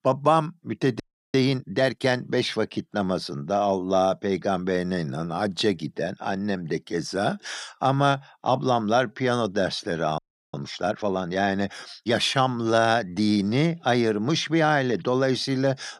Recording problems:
audio freezing; at 1 s and at 10 s

